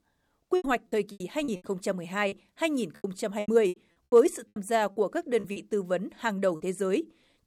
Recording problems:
choppy; very; from 0.5 to 2.5 s and from 3 to 6.5 s; 15% of the speech affected

